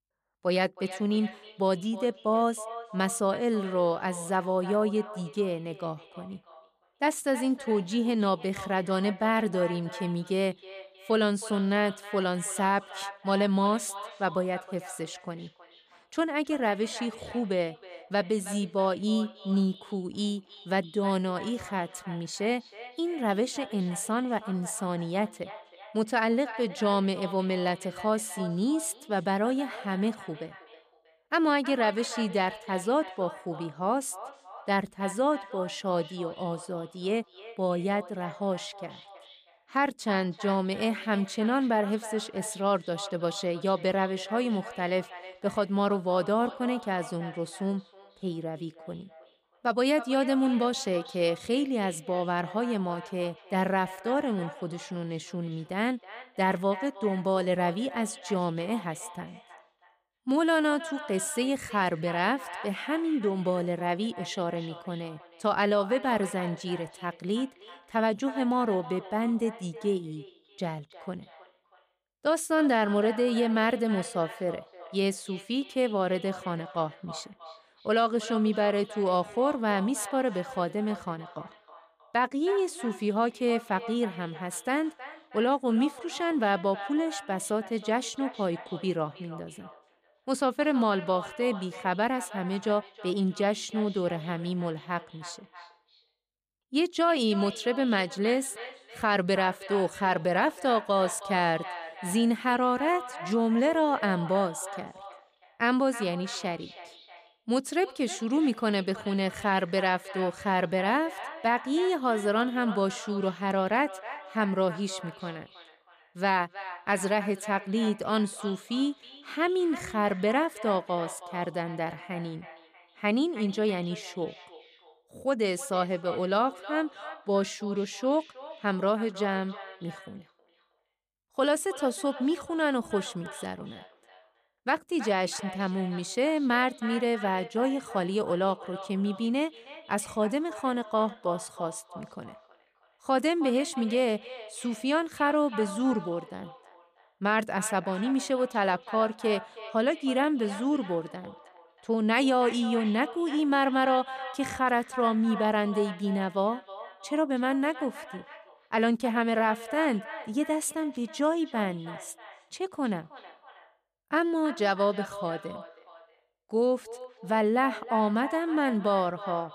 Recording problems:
echo of what is said; noticeable; throughout; 320 ms later, 15 dB below the speech

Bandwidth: 15 kHz